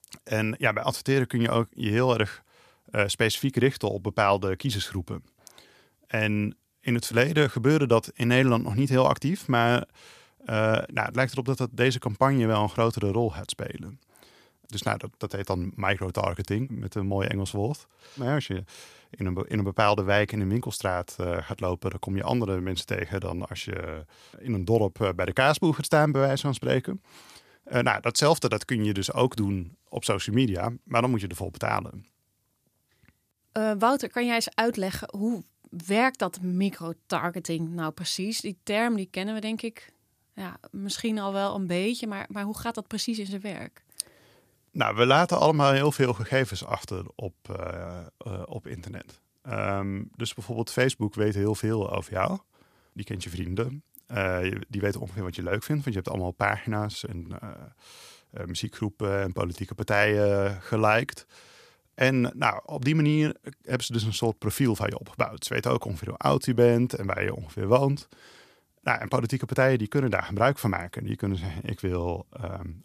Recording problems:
none

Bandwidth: 14.5 kHz